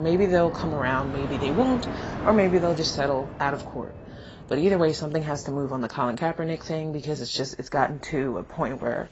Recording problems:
garbled, watery; badly; nothing above 7.5 kHz
train or aircraft noise; noticeable; throughout; 10 dB below the speech
abrupt cut into speech; at the start

